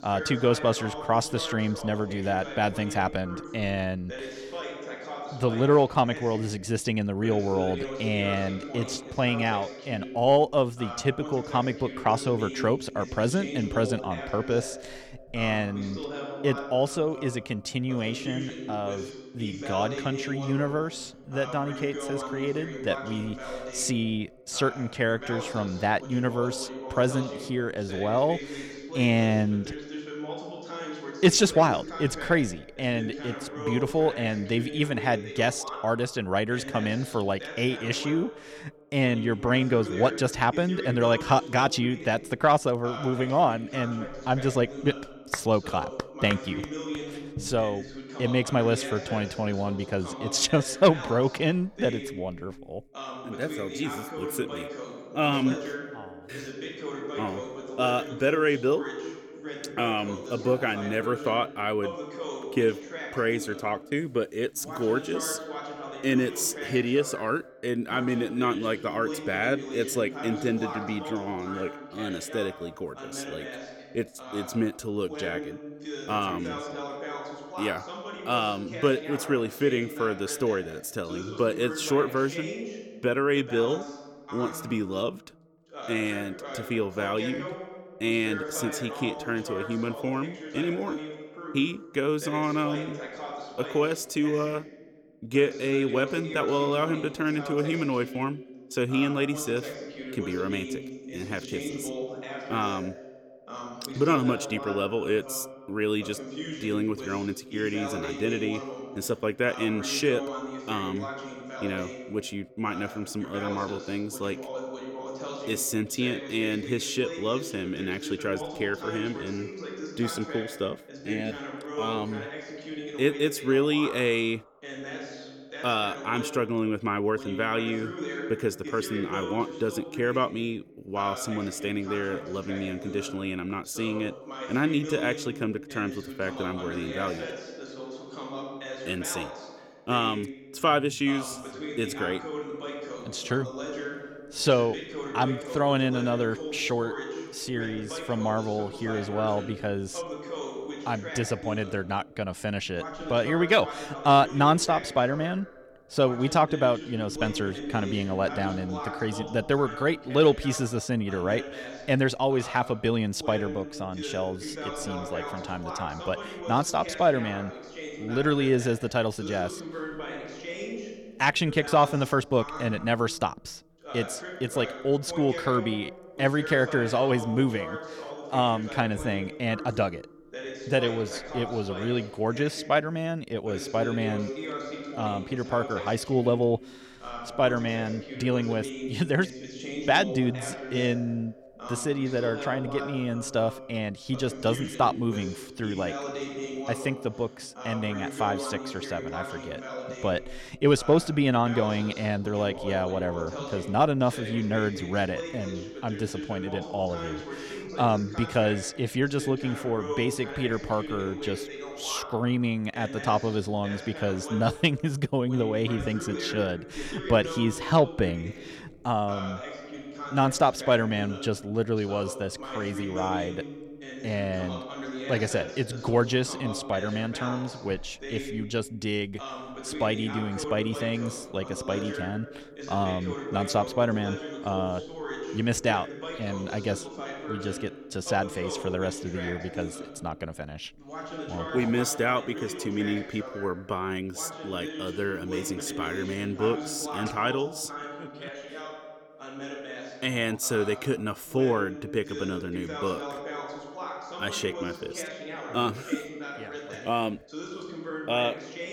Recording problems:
voice in the background; loud; throughout; 10 dB below the speech

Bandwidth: 17.5 kHz